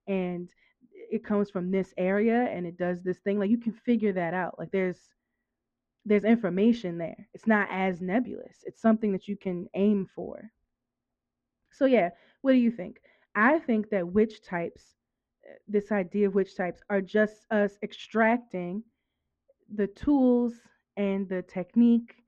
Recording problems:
muffled; very; fading above 2 kHz

